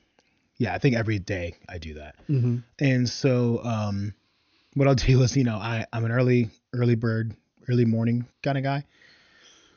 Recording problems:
high frequencies cut off; noticeable; nothing above 6.5 kHz

